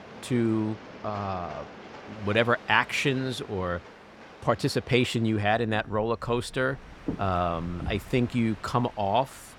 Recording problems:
train or aircraft noise; noticeable; throughout; 15 dB below the speech

